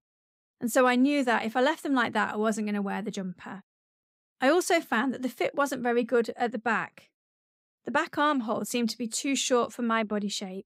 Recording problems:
none

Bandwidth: 15.5 kHz